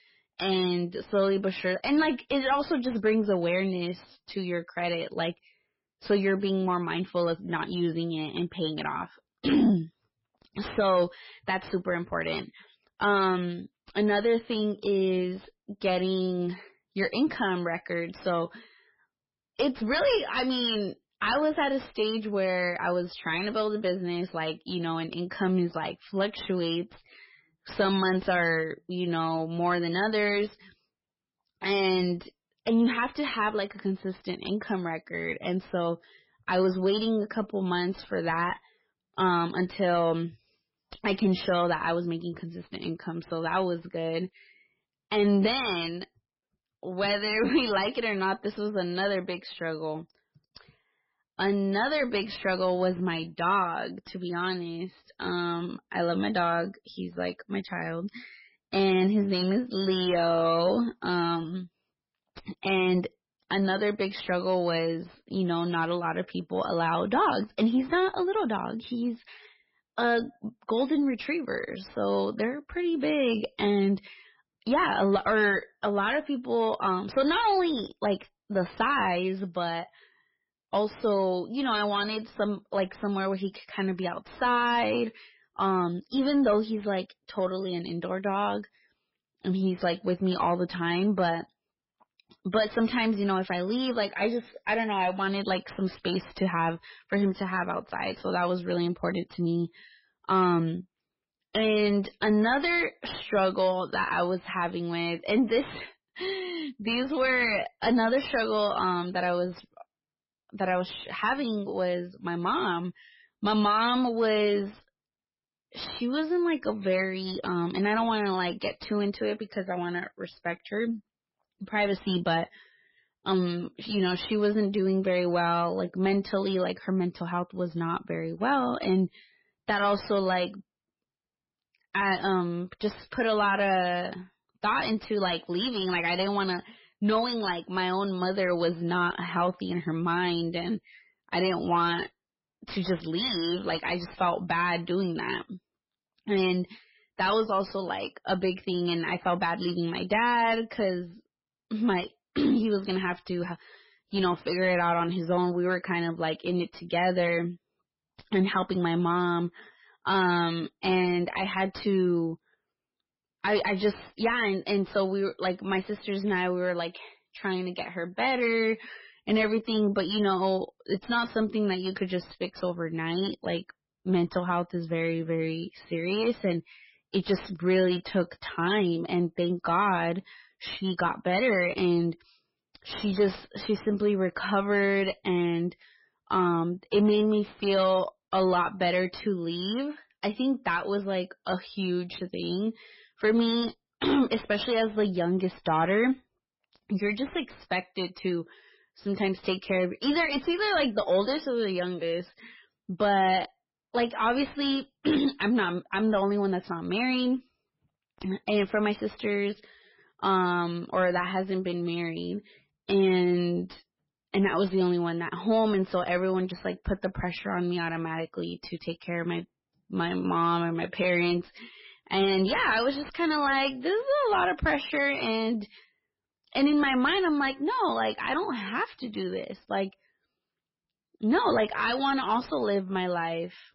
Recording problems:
garbled, watery; badly; nothing above 5 kHz
distortion; slight; 10 dB below the speech

